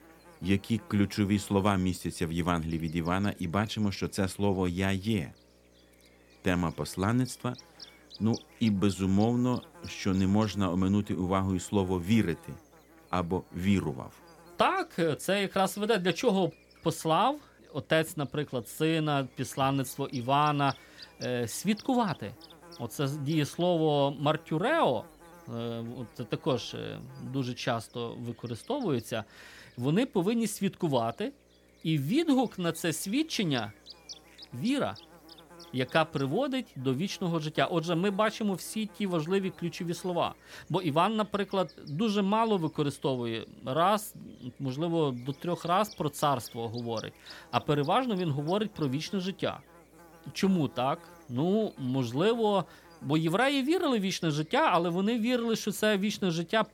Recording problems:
electrical hum; faint; throughout; 60 Hz, 20 dB below the speech

